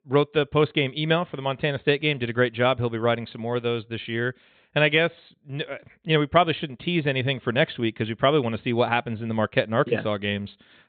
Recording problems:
high frequencies cut off; severe; nothing above 4 kHz

